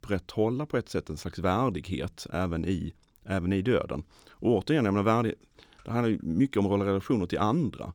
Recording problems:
none

